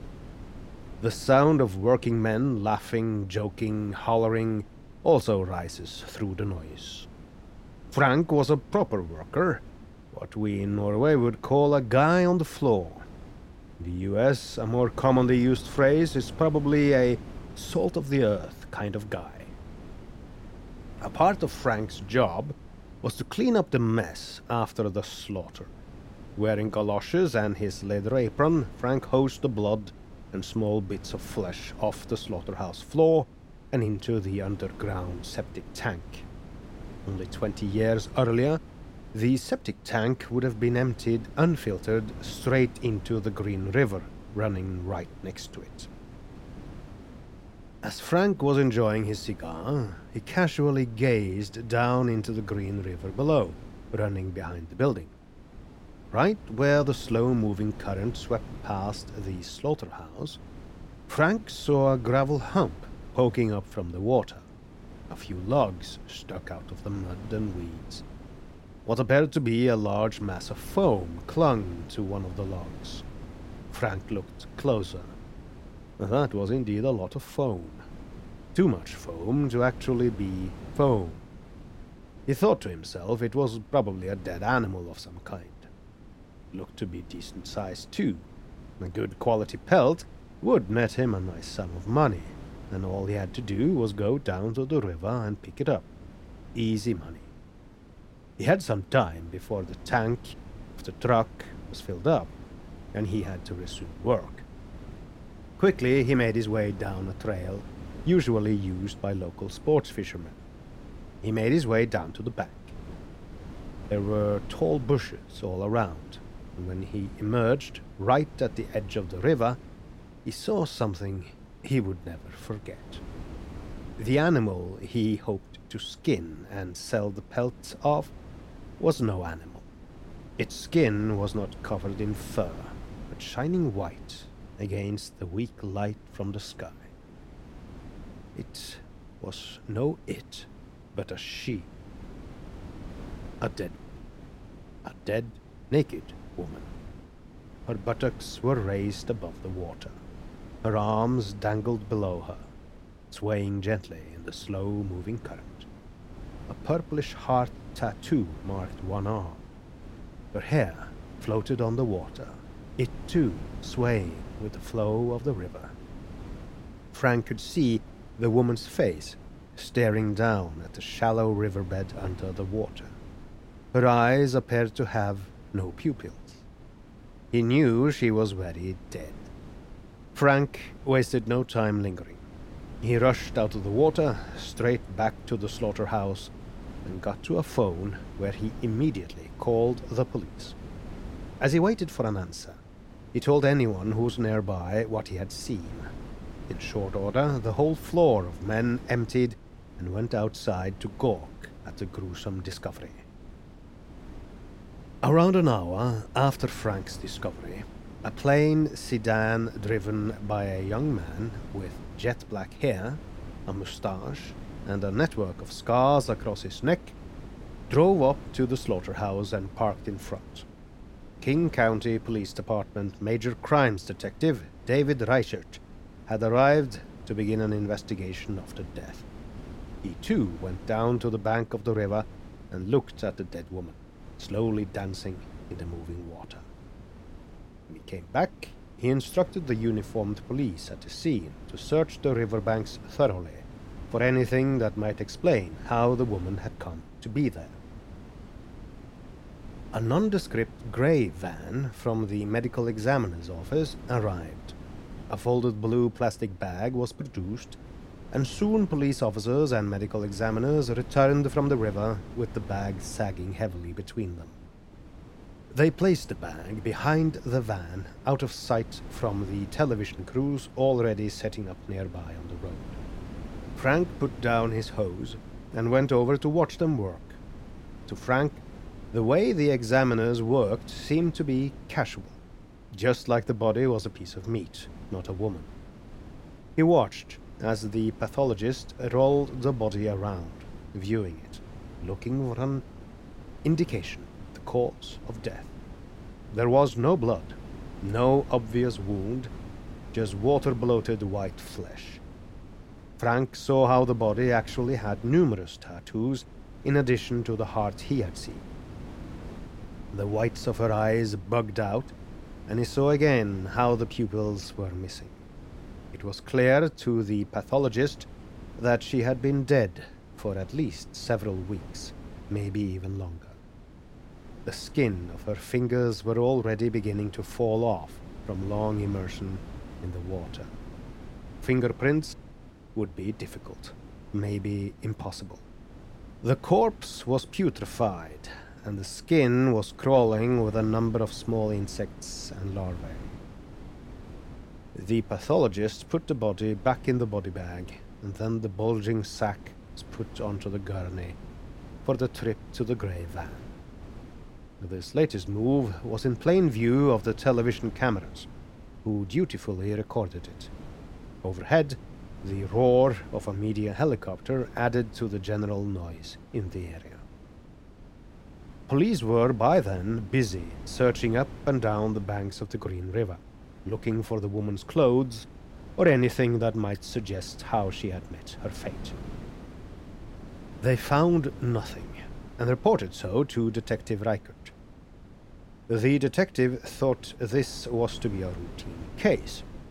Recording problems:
wind noise on the microphone; occasional gusts; 20 dB below the speech

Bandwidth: 16 kHz